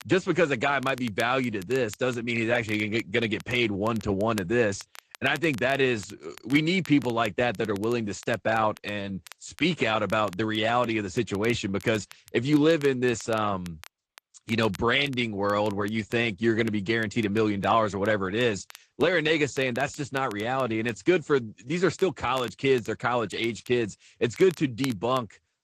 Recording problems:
garbled, watery; slightly
crackle, like an old record; faint; 20 dB below the speech

